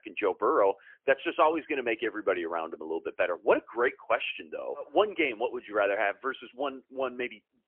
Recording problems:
phone-call audio; poor line; nothing above 3 kHz

